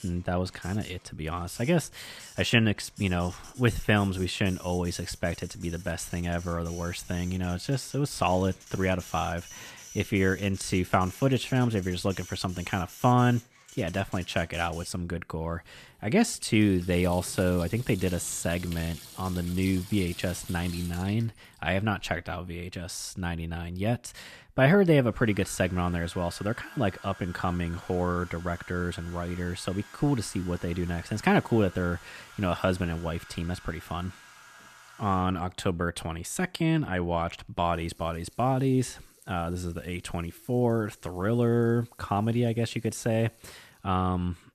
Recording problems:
household noises; noticeable; throughout; 20 dB below the speech

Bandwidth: 14.5 kHz